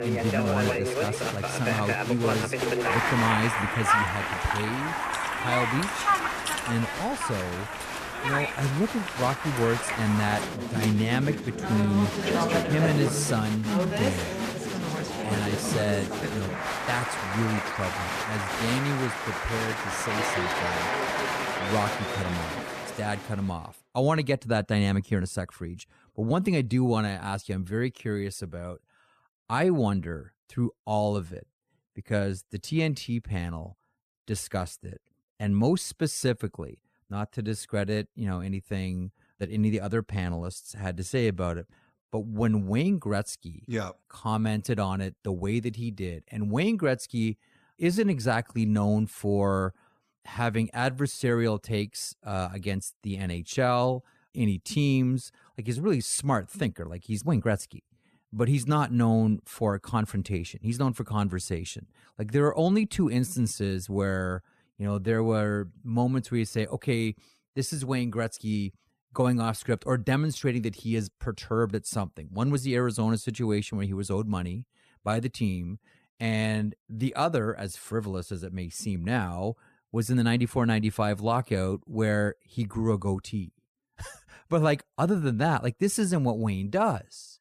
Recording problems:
crowd noise; loud; until 23 s; as loud as the speech

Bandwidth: 14.5 kHz